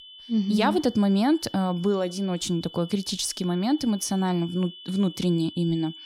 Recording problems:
high-pitched whine; noticeable; throughout; 3 kHz, 15 dB below the speech

